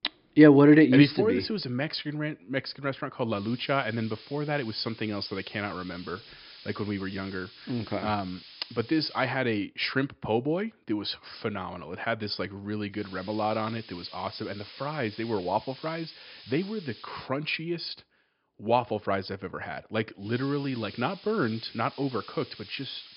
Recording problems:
high frequencies cut off; noticeable; nothing above 5.5 kHz
hiss; noticeable; from 3.5 to 9.5 s, from 13 to 17 s and from 20 s on; 20 dB below the speech

